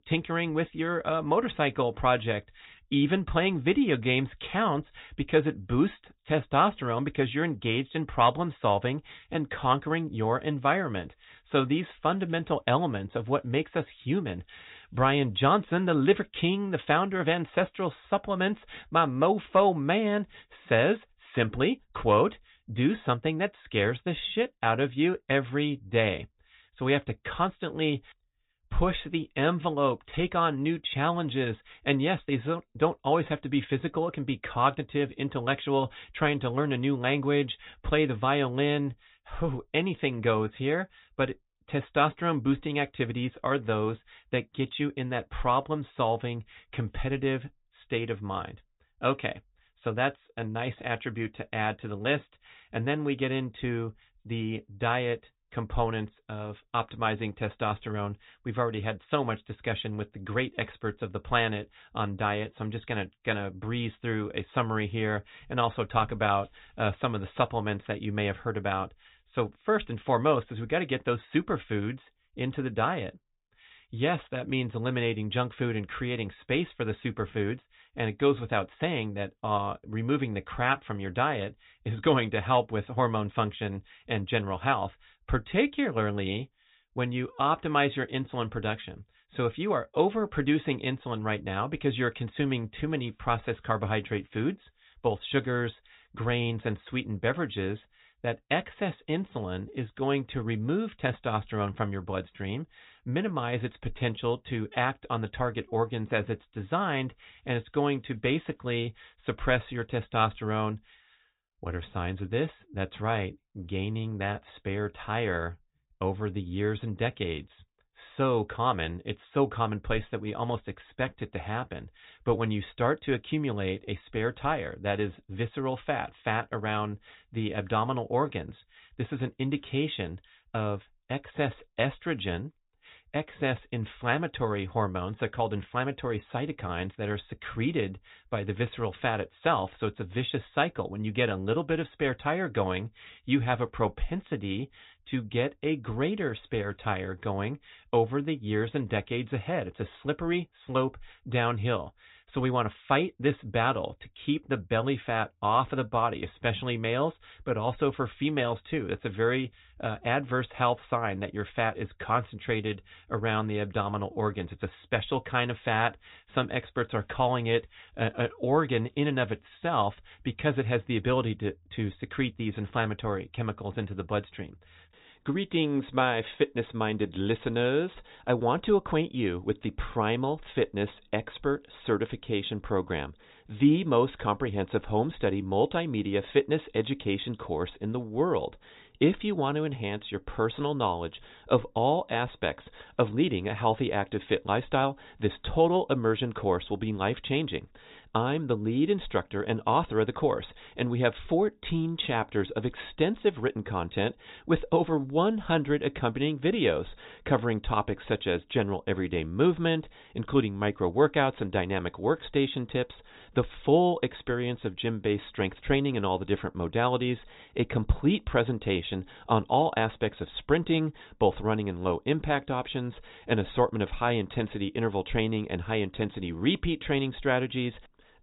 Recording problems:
high frequencies cut off; severe; nothing above 4 kHz

